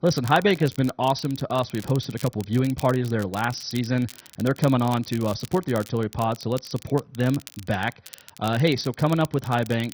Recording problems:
garbled, watery; badly; nothing above 6 kHz
crackle, like an old record; noticeable; 20 dB below the speech

